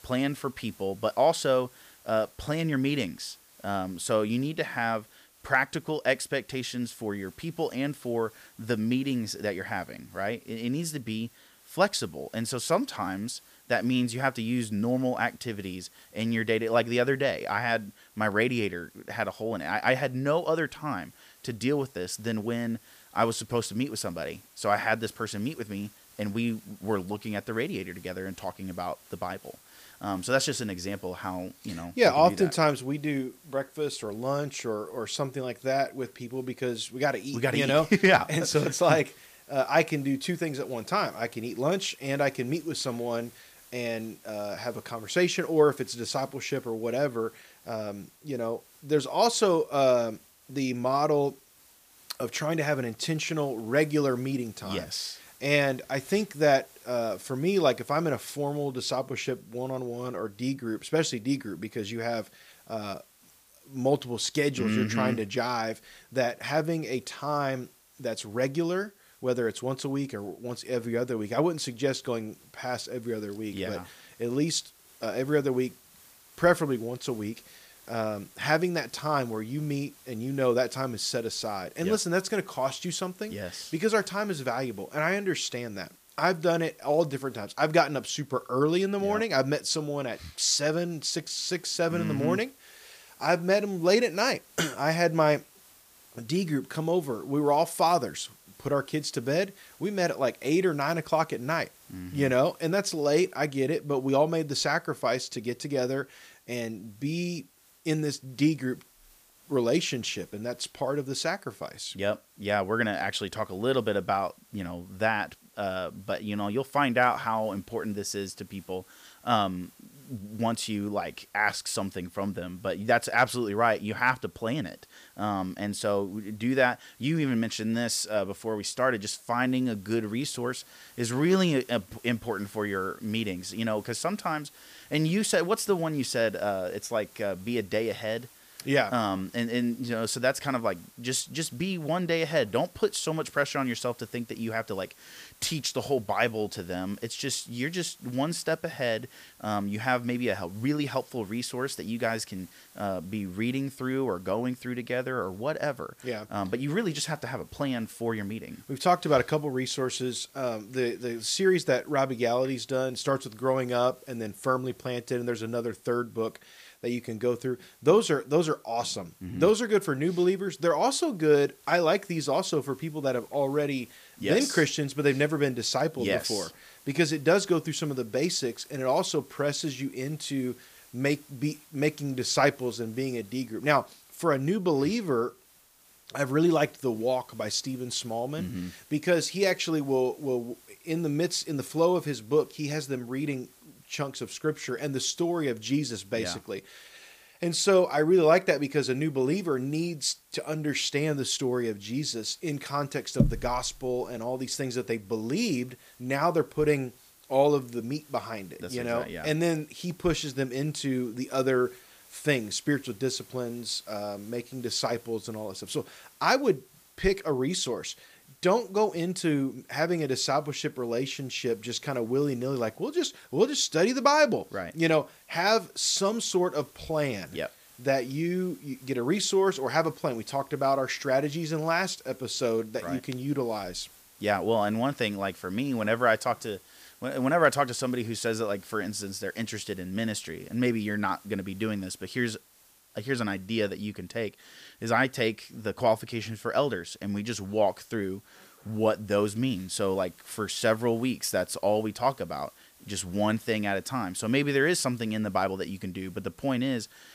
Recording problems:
hiss; faint; throughout; 25 dB below the speech

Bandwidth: 15 kHz